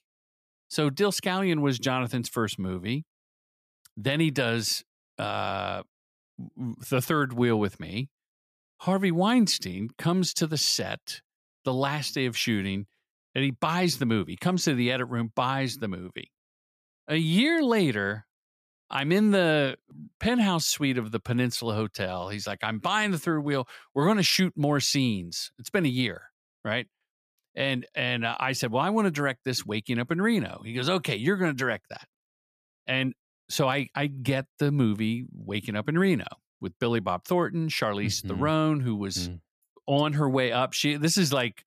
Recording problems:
none

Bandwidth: 14.5 kHz